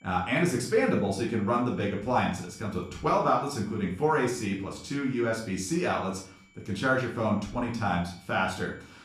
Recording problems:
off-mic speech; far
room echo; slight; dies away in 0.4 s
high-pitched whine; faint; throughout; 2.5 kHz, 30 dB below the speech

